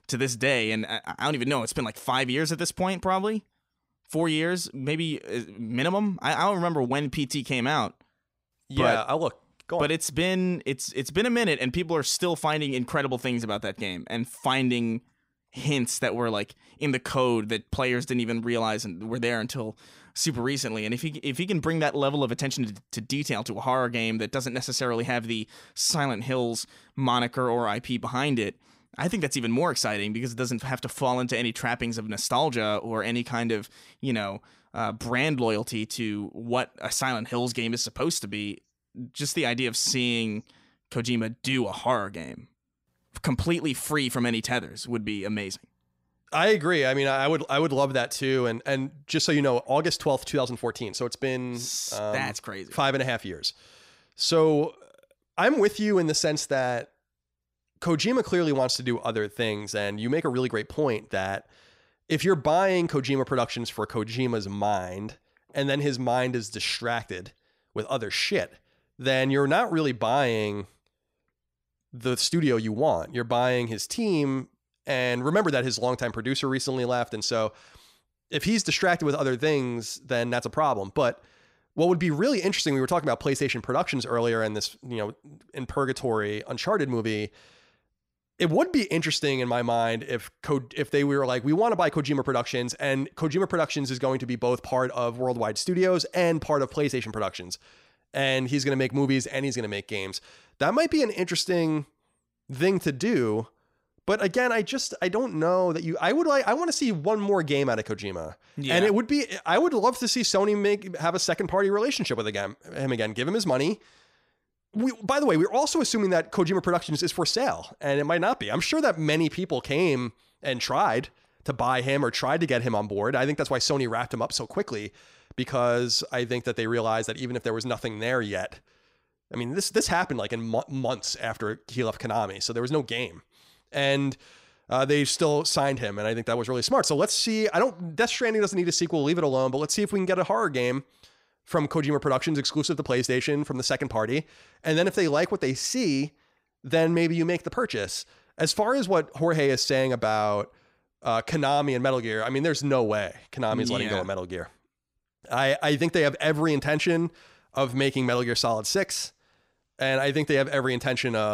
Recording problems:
abrupt cut into speech; at the end

